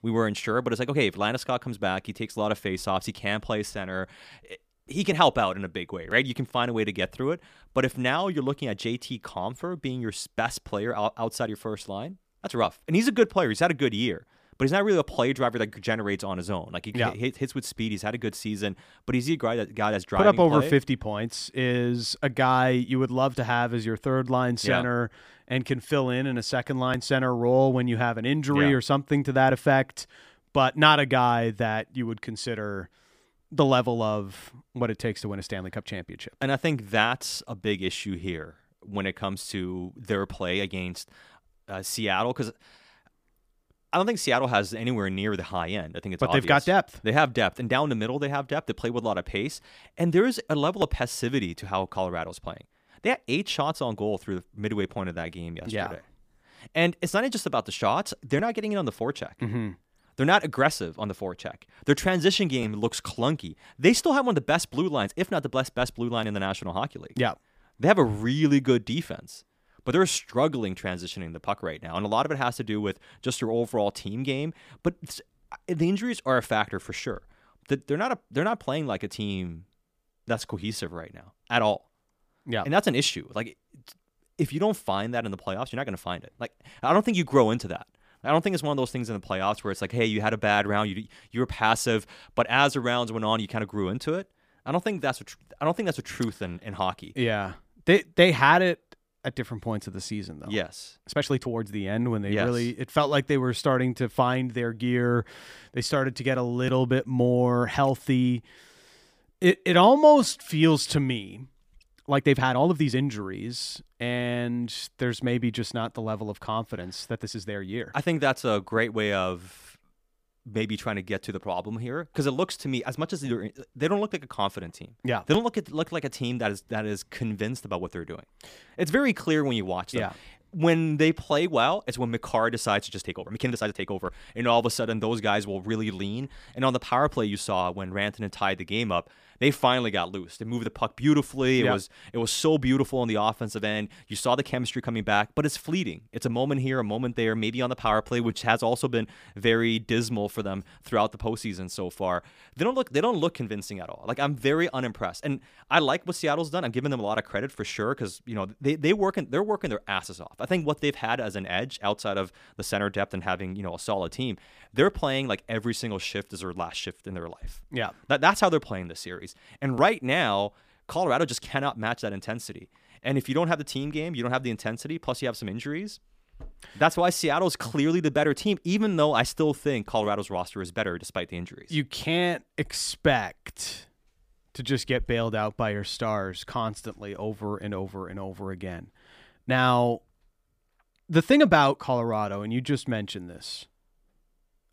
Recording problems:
uneven, jittery; strongly; from 12 s to 3:12

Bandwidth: 15 kHz